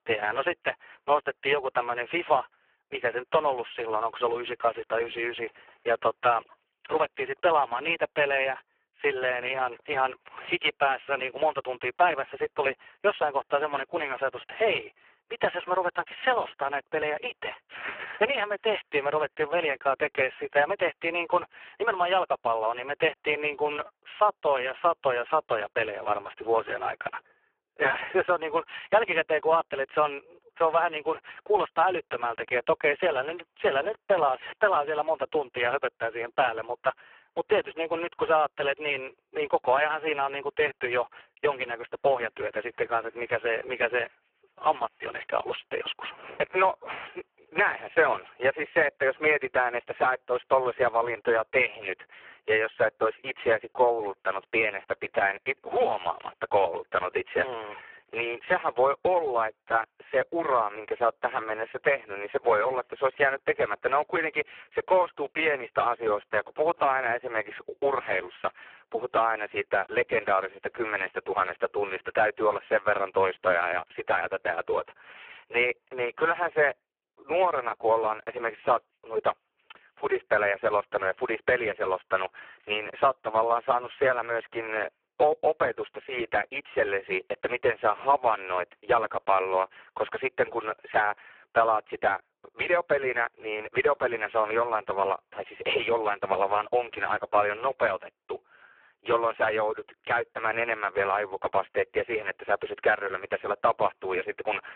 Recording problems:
phone-call audio; poor line
thin; very; fading below 350 Hz

